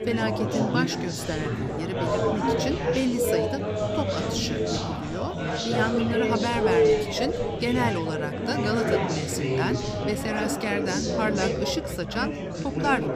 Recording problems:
chatter from many people; very loud; throughout; 3 dB above the speech

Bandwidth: 15 kHz